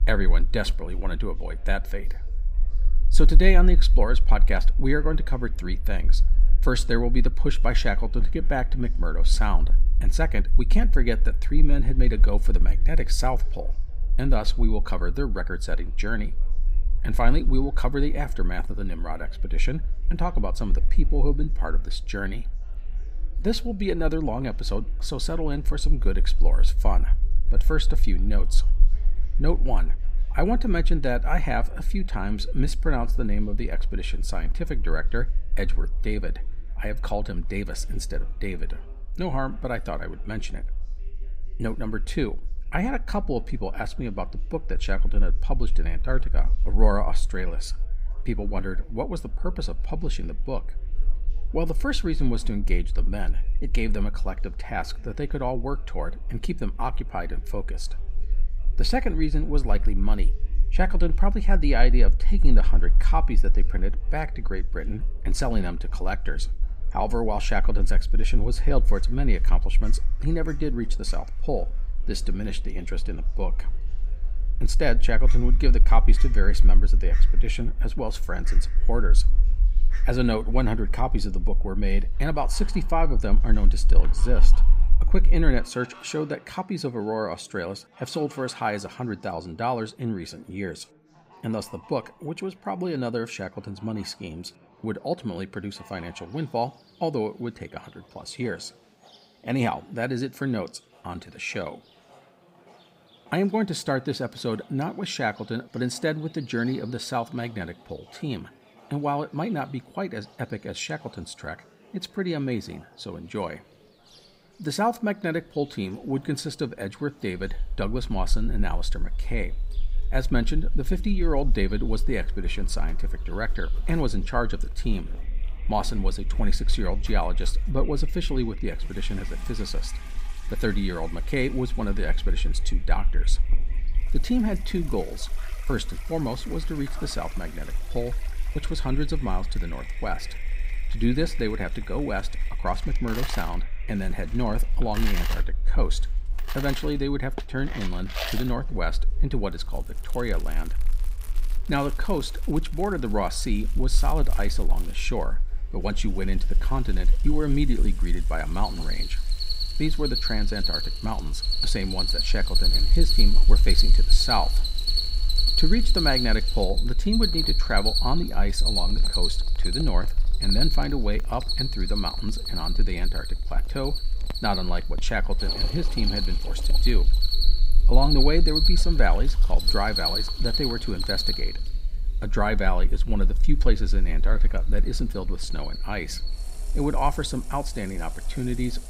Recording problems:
animal sounds; very loud; throughout; 1 dB above the speech
household noises; noticeable; from 1:54 on; 15 dB below the speech
background chatter; faint; throughout; 3 voices, 30 dB below the speech
low rumble; faint; until 1:26 and from 1:57 on; 25 dB below the speech

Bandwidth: 15.5 kHz